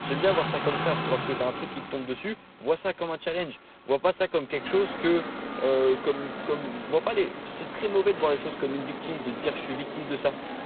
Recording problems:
phone-call audio; poor line; nothing above 4 kHz
traffic noise; loud; throughout; 6 dB below the speech

